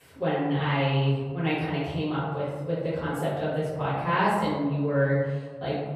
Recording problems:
off-mic speech; far
room echo; noticeable; dies away in 1.4 s

